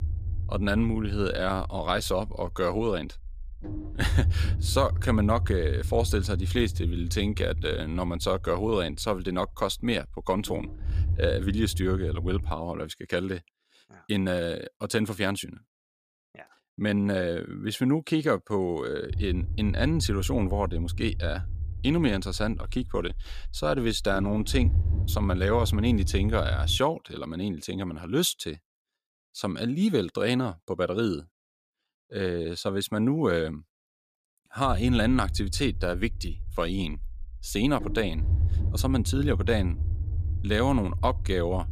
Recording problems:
low rumble; noticeable; until 13 s, from 19 to 27 s and from 35 s on; 15 dB below the speech

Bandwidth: 14.5 kHz